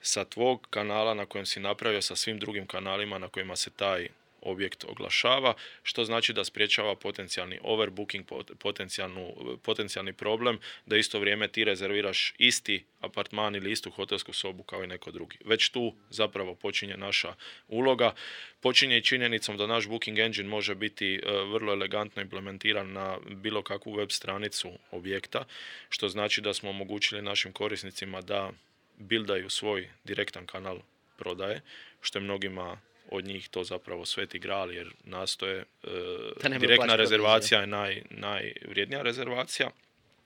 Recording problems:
thin; very slightly; fading below 850 Hz

